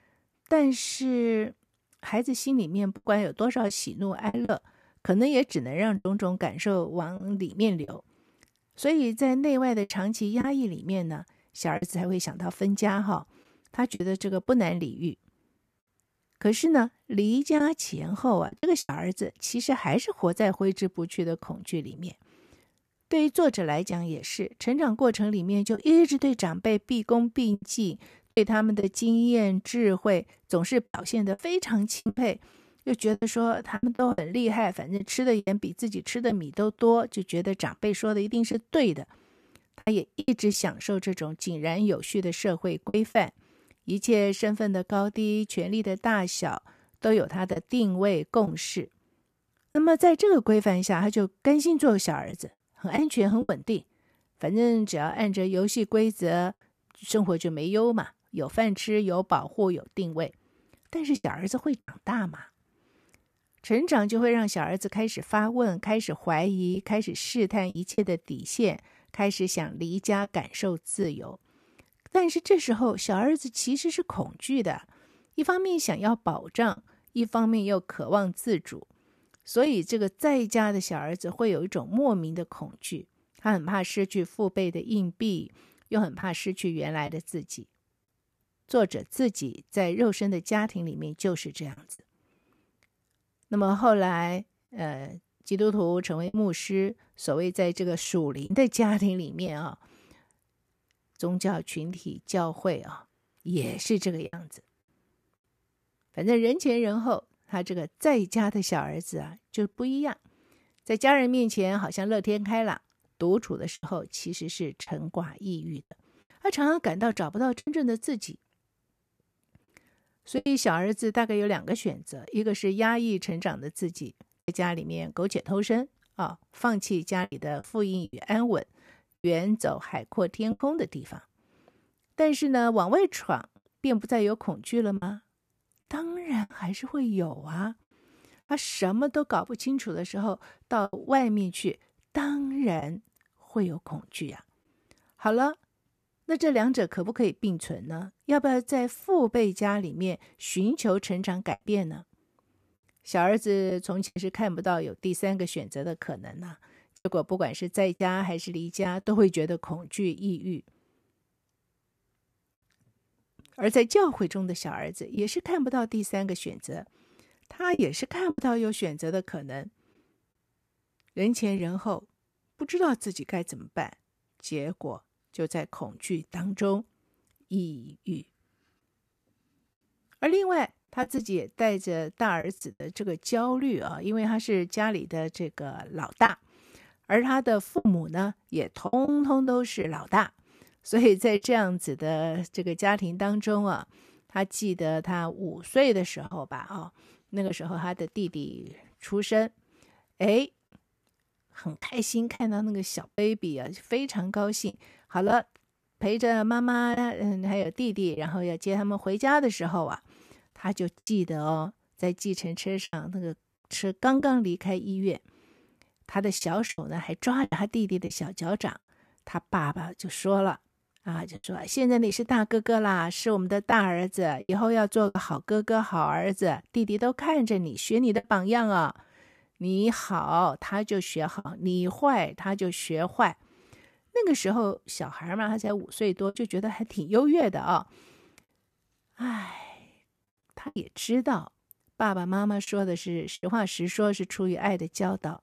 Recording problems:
choppy; occasionally; 3% of the speech affected

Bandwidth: 14.5 kHz